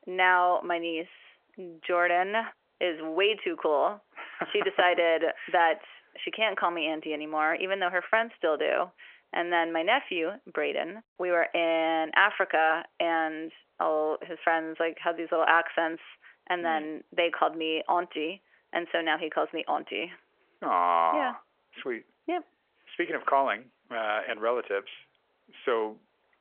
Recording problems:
phone-call audio; nothing above 3 kHz

